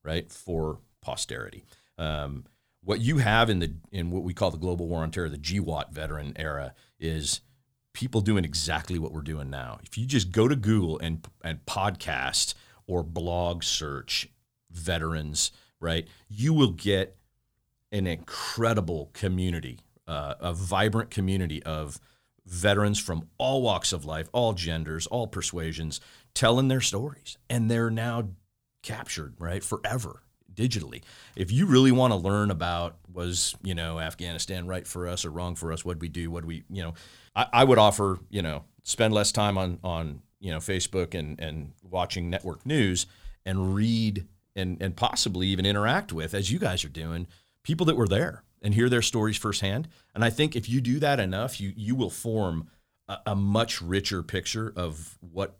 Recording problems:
none

